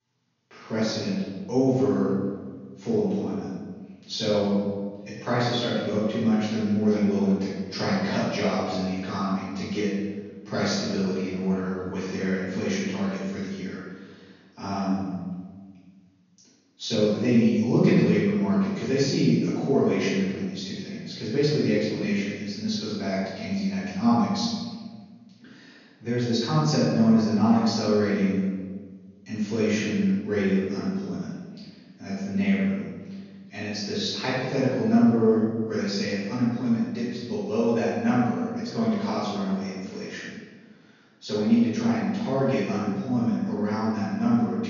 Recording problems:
room echo; strong; dies away in 1.4 s
off-mic speech; far
high frequencies cut off; noticeable; nothing above 7 kHz

